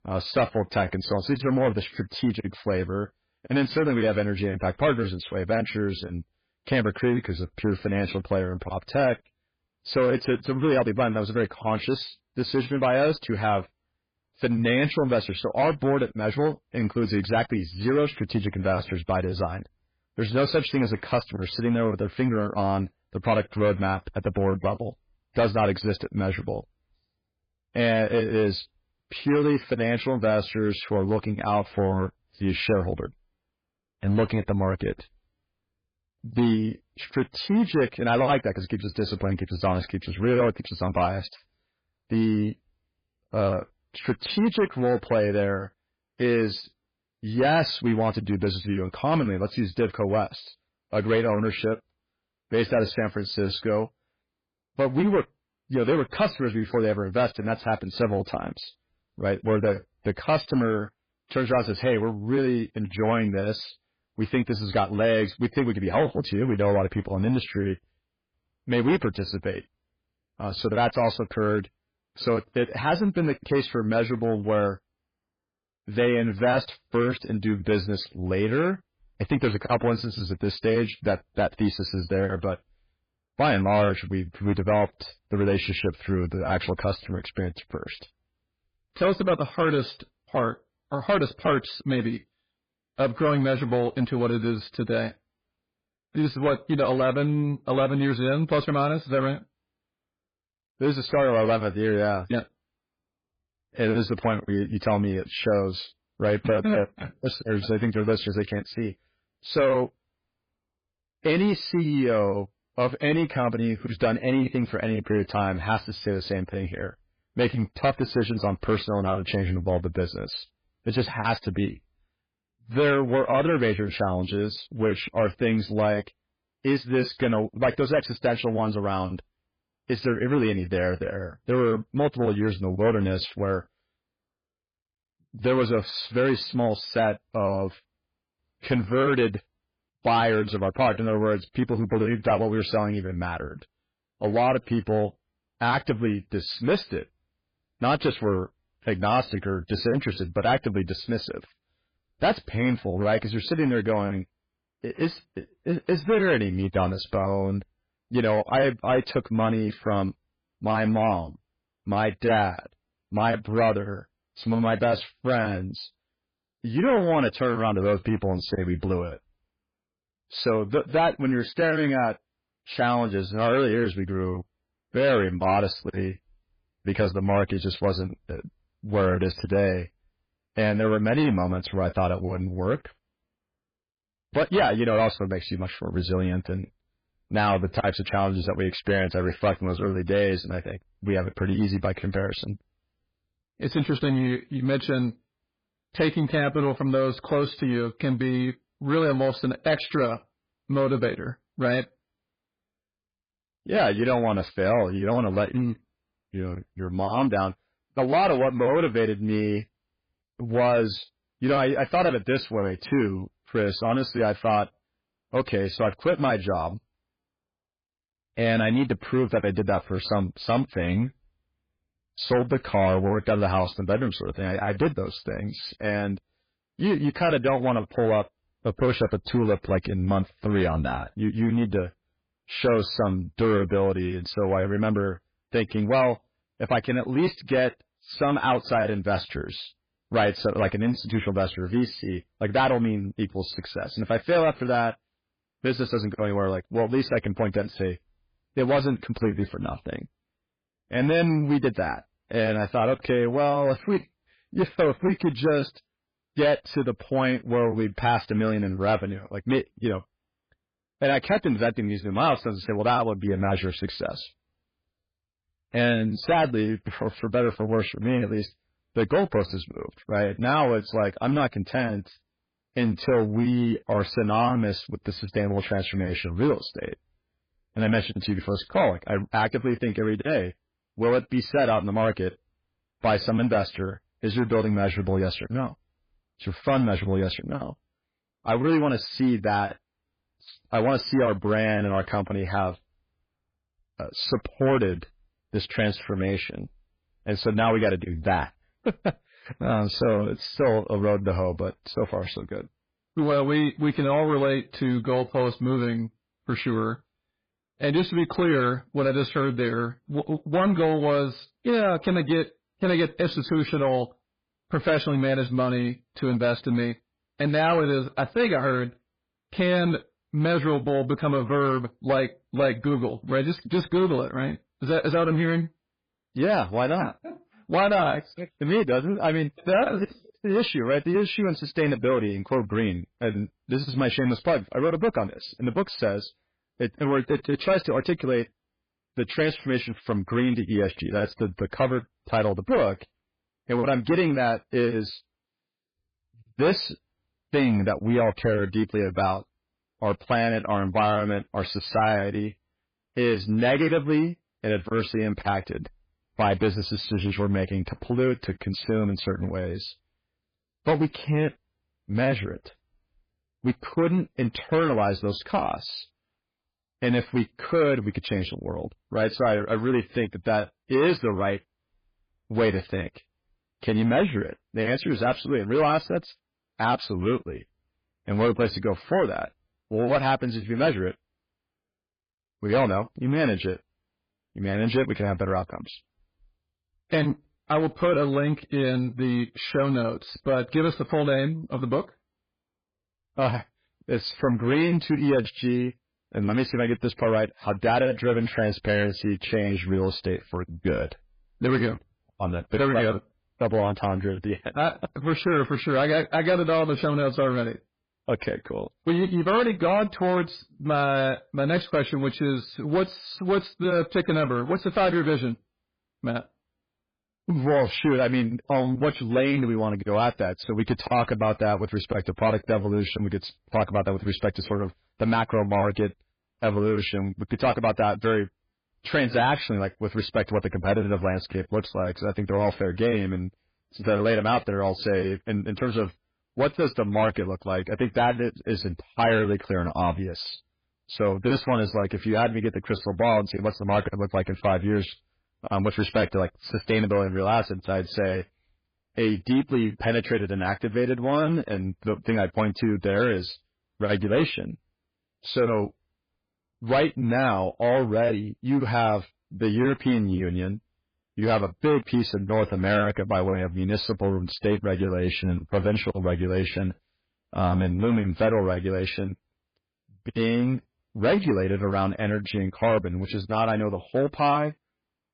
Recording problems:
garbled, watery; badly
distortion; slight; 5% of the sound clipped

